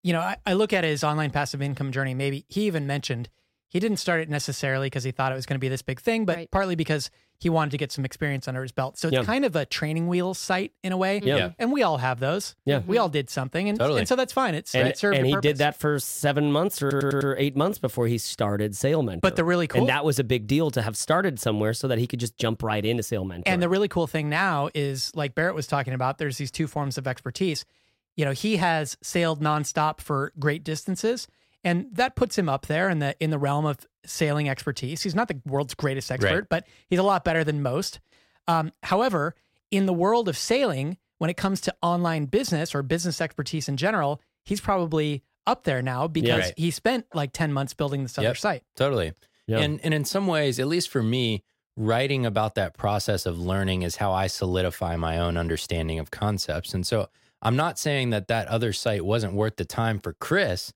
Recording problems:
audio stuttering; at 17 s

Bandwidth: 16 kHz